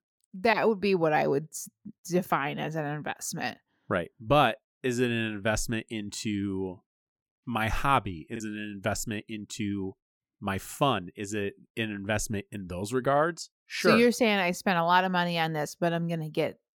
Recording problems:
choppy; occasionally; at 8.5 s; 3% of the speech affected

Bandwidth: 18 kHz